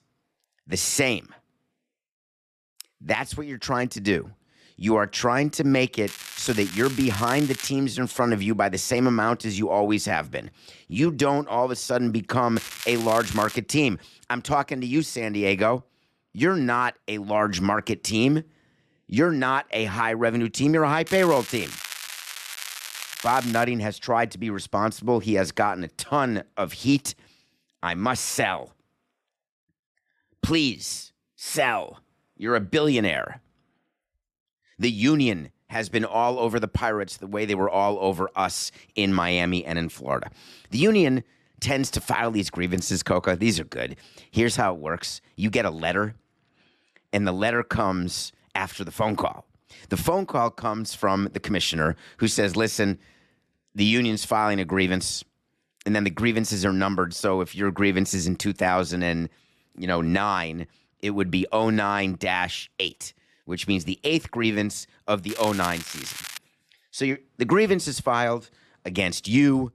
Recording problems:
crackling; noticeable; 4 times, first at 6 s; 10 dB below the speech

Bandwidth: 13.5 kHz